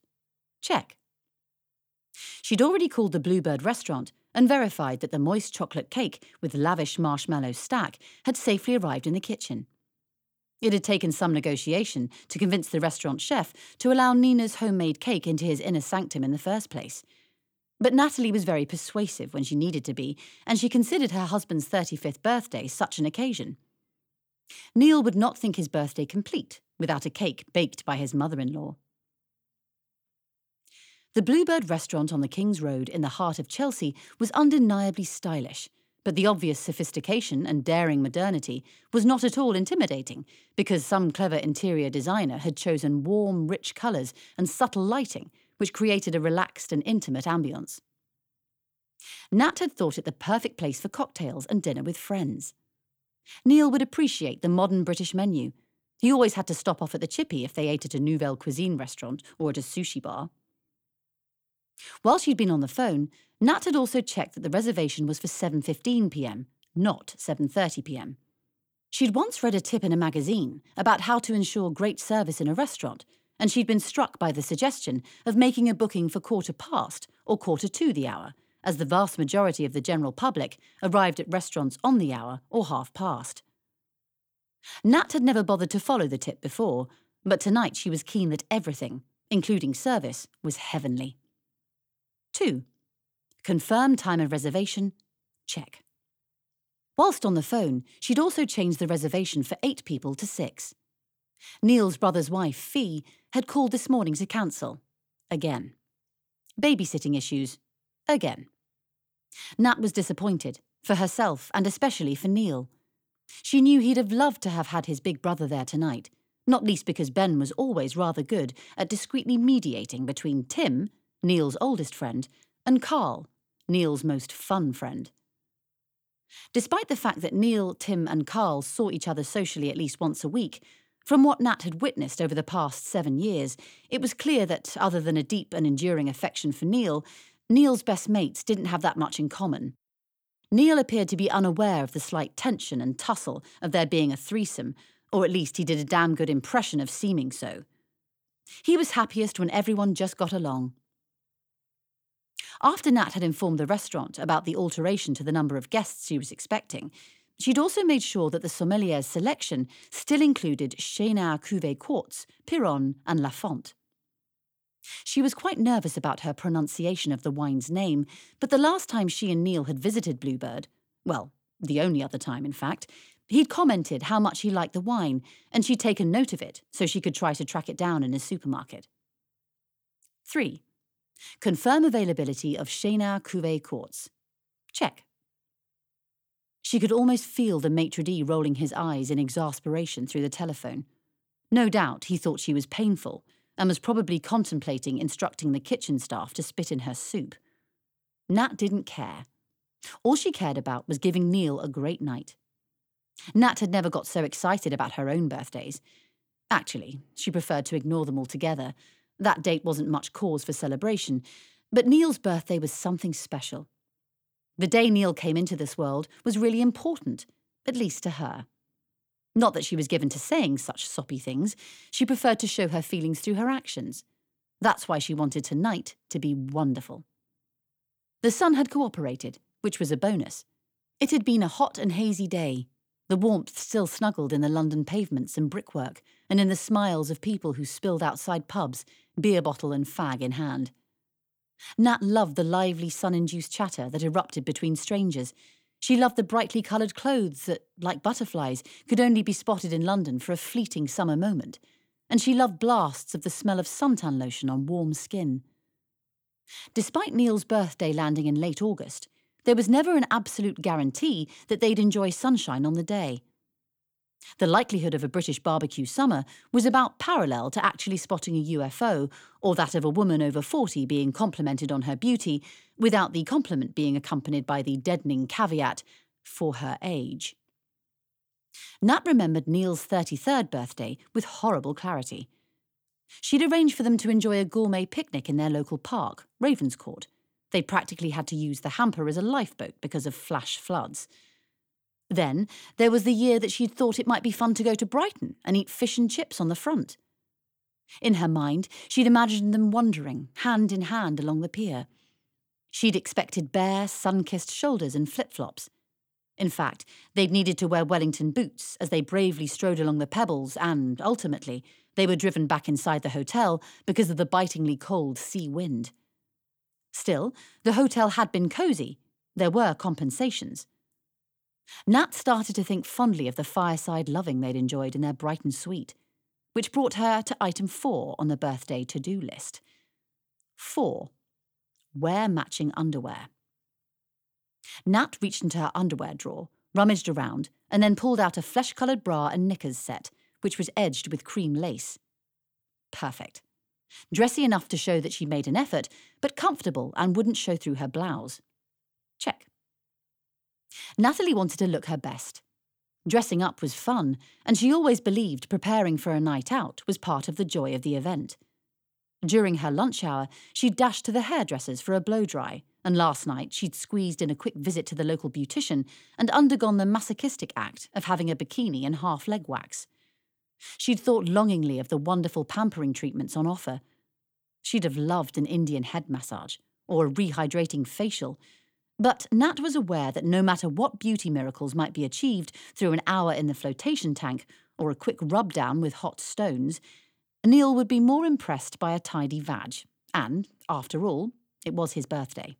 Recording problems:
none

